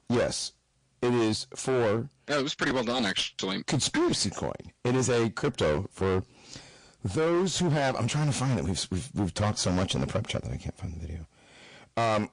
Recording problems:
distortion; heavy; 16% of the sound clipped
garbled, watery; slightly; nothing above 10 kHz

